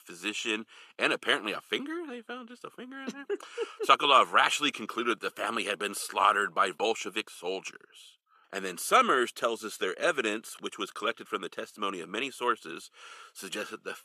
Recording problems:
thin; somewhat; fading below 300 Hz

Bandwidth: 14 kHz